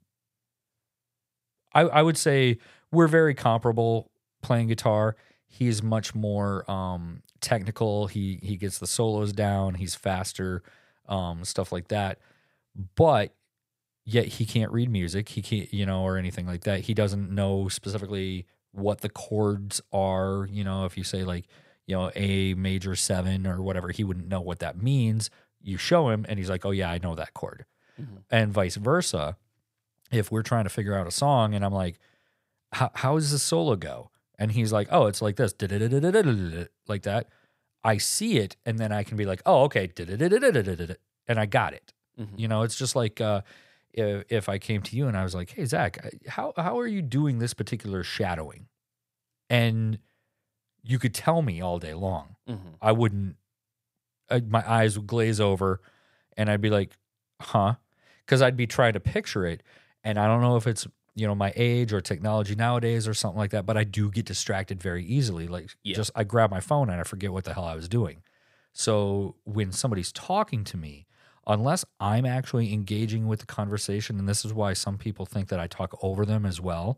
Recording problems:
none

